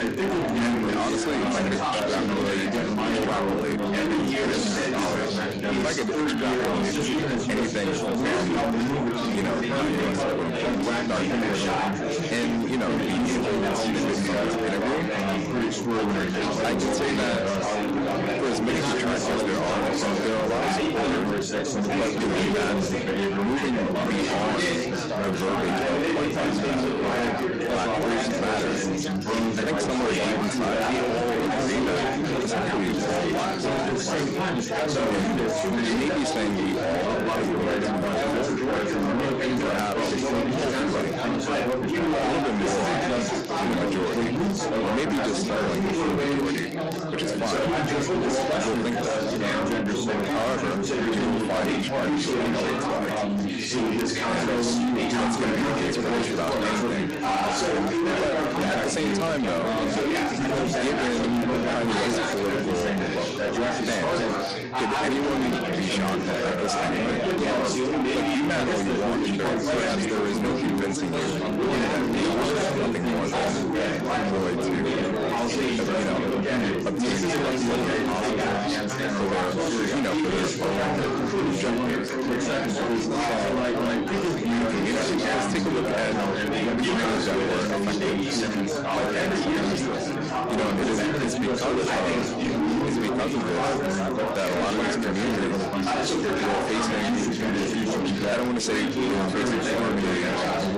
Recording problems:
distortion; heavy; 7 dB below the speech
garbled, watery; slightly; nothing above 11 kHz
chatter from many people; very loud; throughout; 2 dB above the speech
crackle, like an old record; faint; 25 dB below the speech

